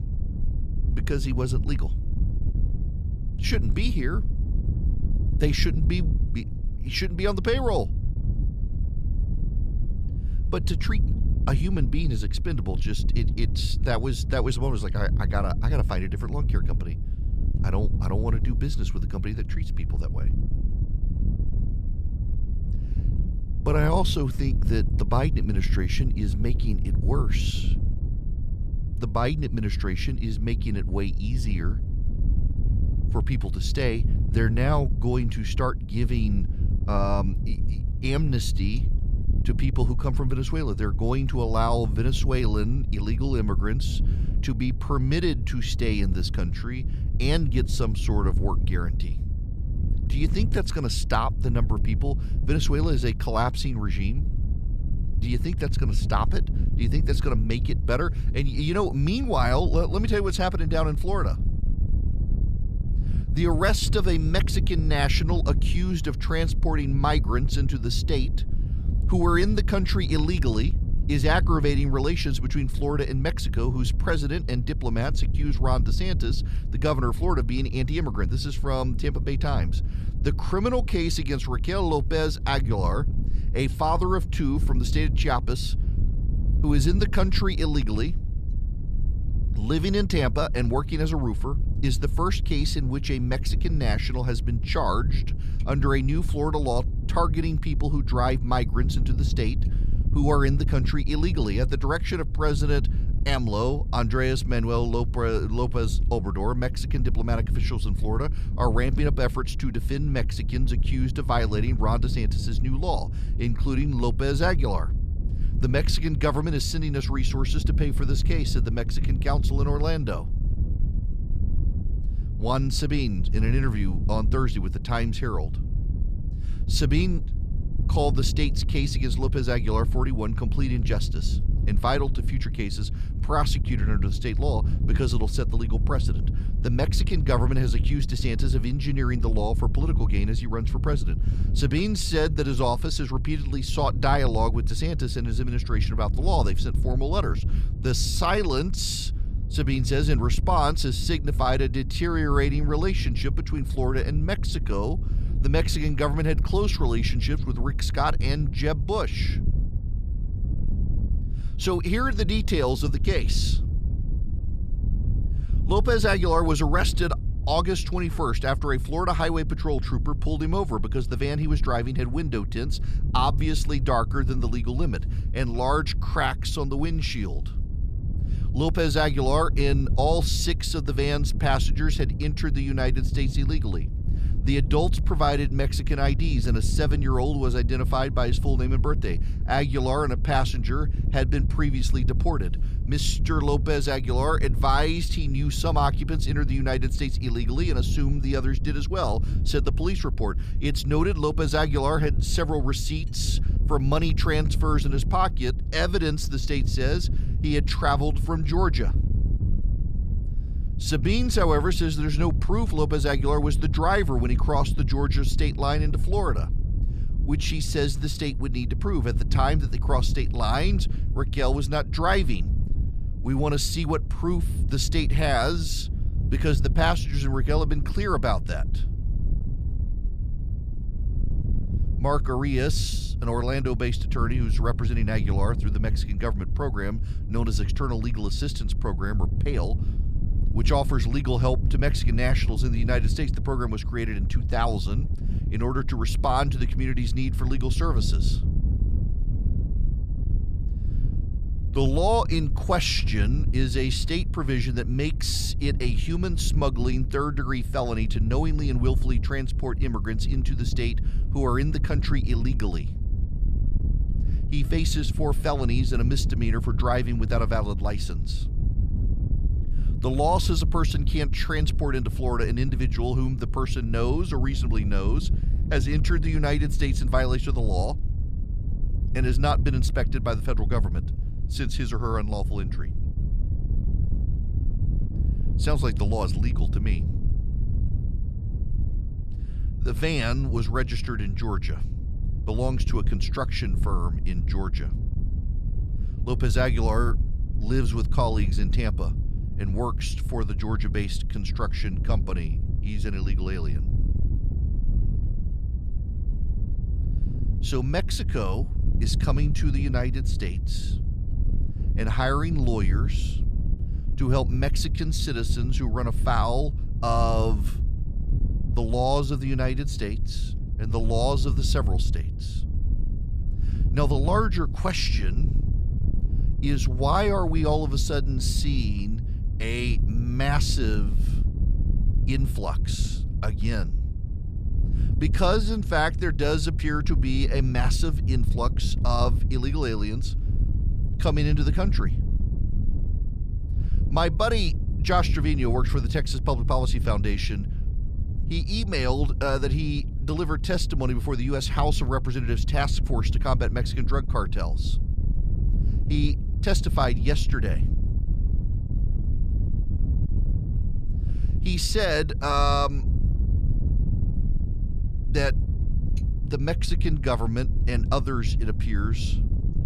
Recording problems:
wind noise on the microphone; occasional gusts; 15 dB below the speech

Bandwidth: 14.5 kHz